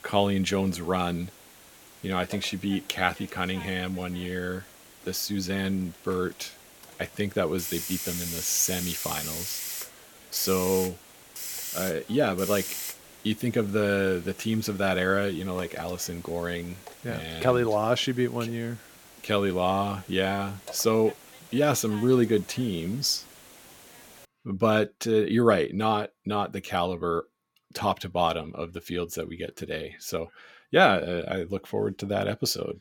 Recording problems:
hiss; loud; until 24 s; 10 dB below the speech

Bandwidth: 17 kHz